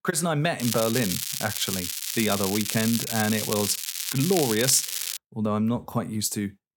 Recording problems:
crackling; loud; from 0.5 to 5 s; 2 dB below the speech

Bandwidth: 17 kHz